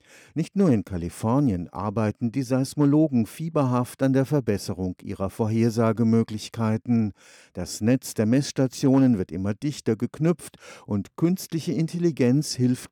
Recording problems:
none

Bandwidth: 18.5 kHz